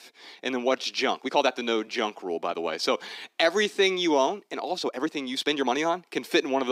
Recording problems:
thin; somewhat; fading below 300 Hz
uneven, jittery; strongly; from 0.5 to 6 s
abrupt cut into speech; at the end

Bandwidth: 15.5 kHz